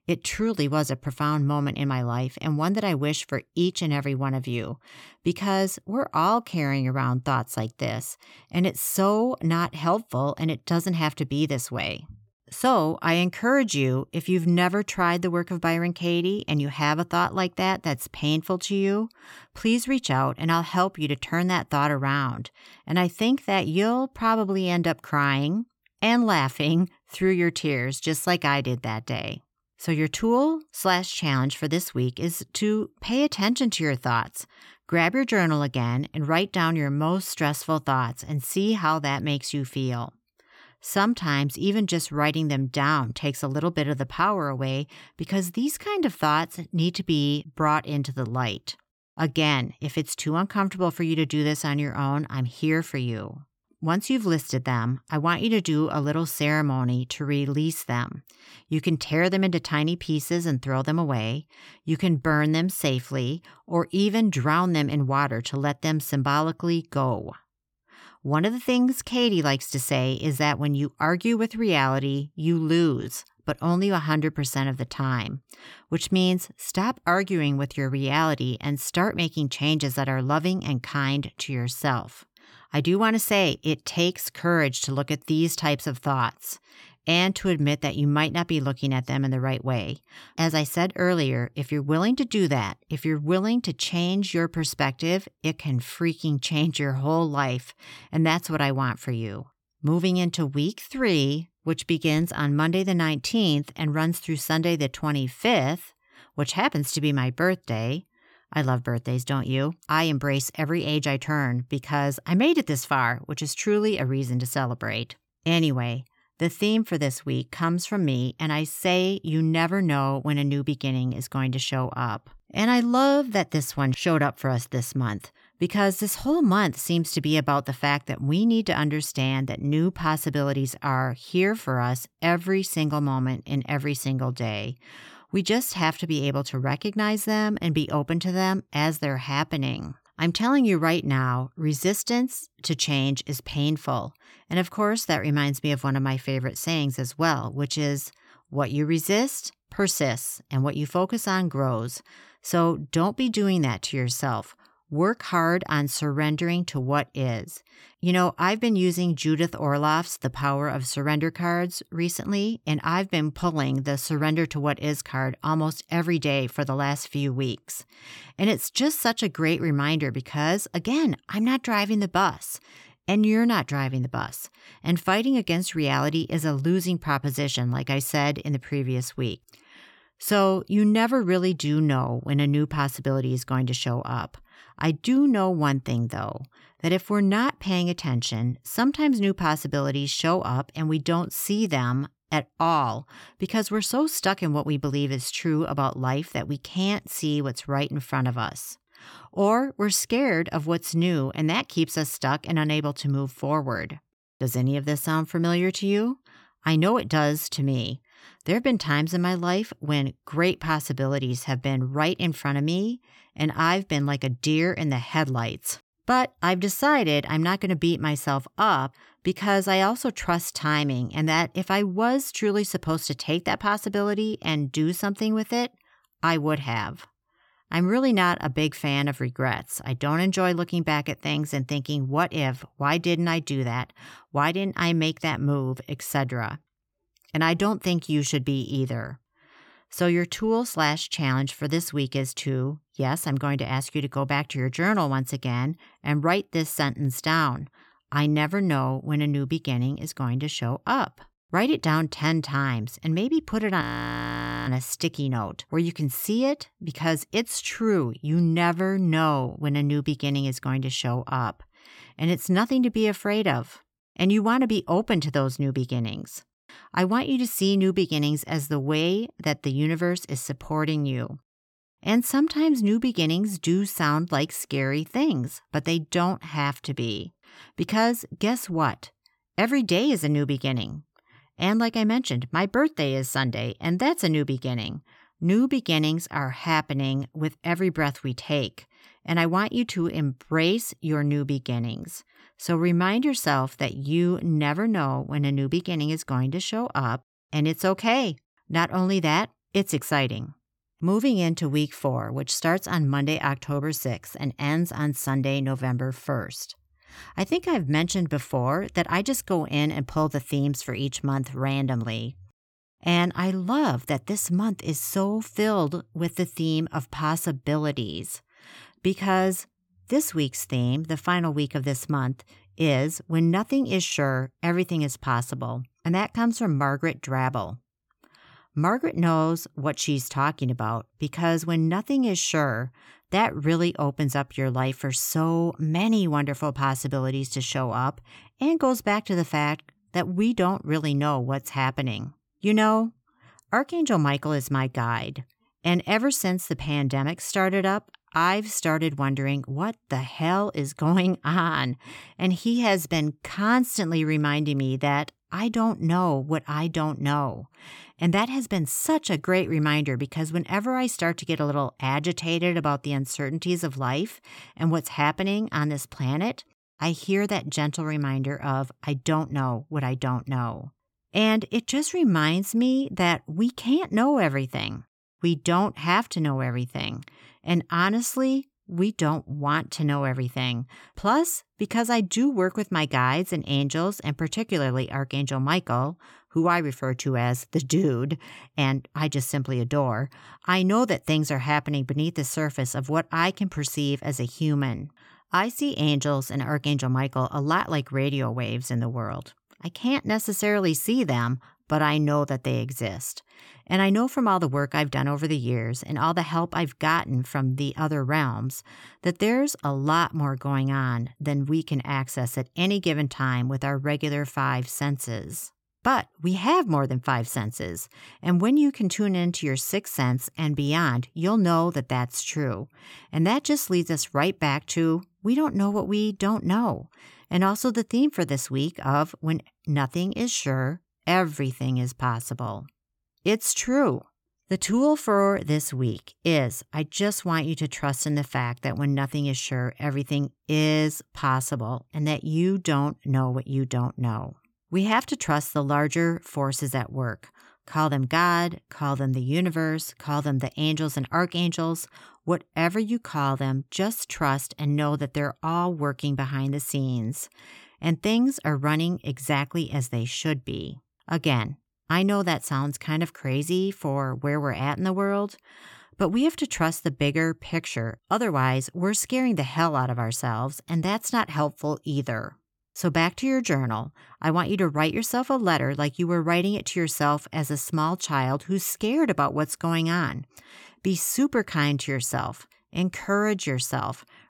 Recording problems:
audio freezing; at 4:14 for 1 s

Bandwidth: 17.5 kHz